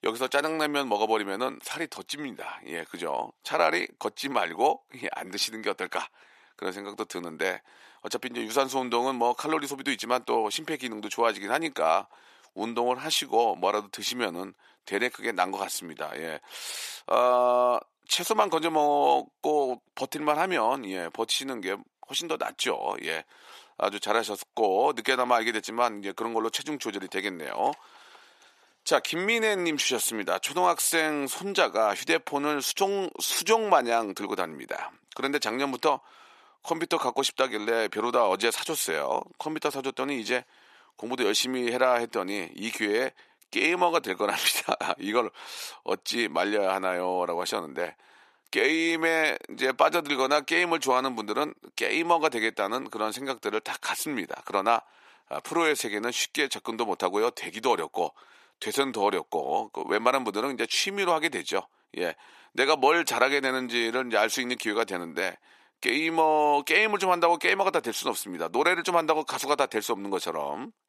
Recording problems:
thin; somewhat; fading below 400 Hz

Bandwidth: 14 kHz